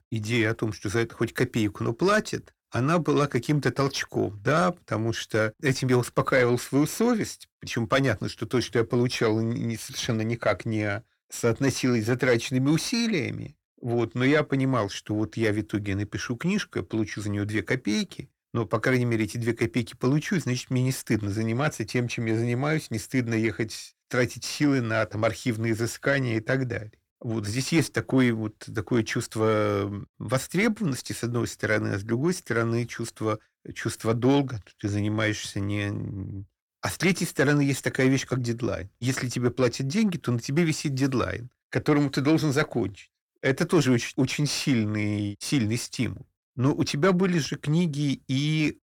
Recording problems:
distortion; slight; 10 dB below the speech

